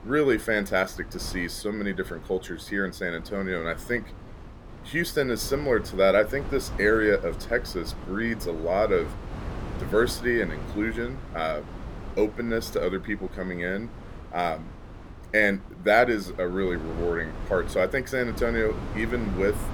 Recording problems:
wind noise on the microphone; occasional gusts; 15 dB below the speech

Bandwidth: 17.5 kHz